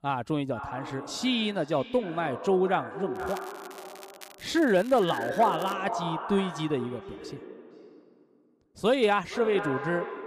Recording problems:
echo of what is said; strong; throughout; 460 ms later, 9 dB below the speech
crackling; faint; from 3 to 5.5 s; 20 dB below the speech

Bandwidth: 15 kHz